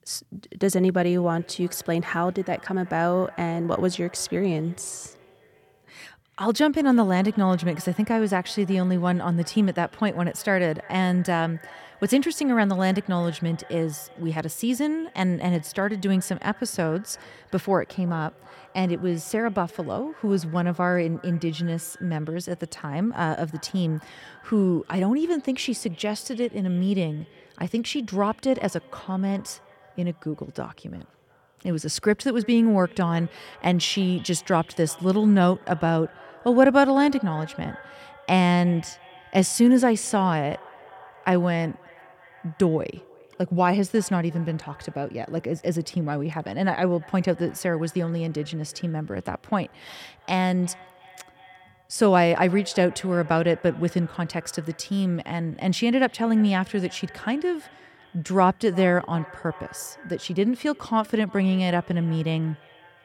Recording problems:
echo of what is said; faint; throughout; 350 ms later, 25 dB below the speech

